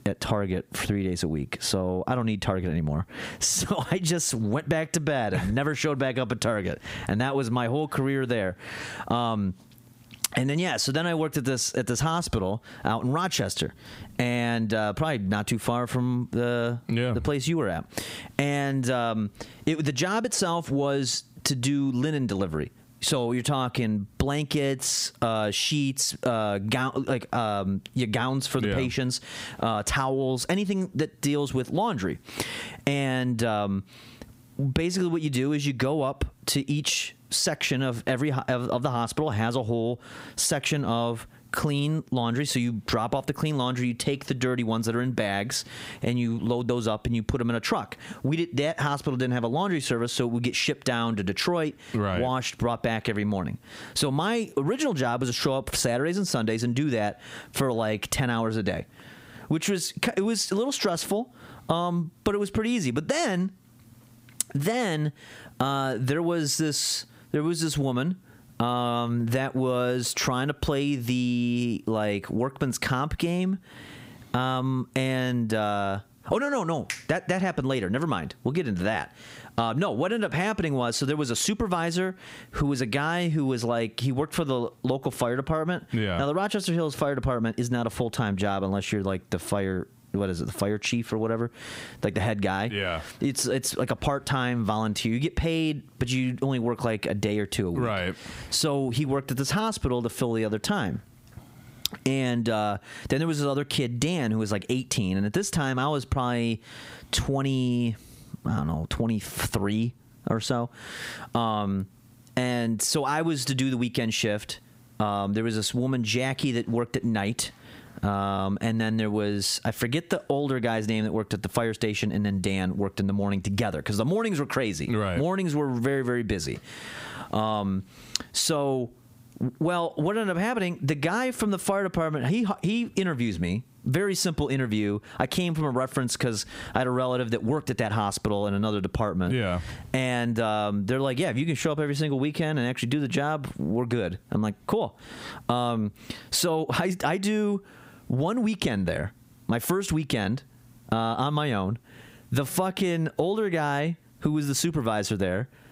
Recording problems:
squashed, flat; heavily

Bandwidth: 15.5 kHz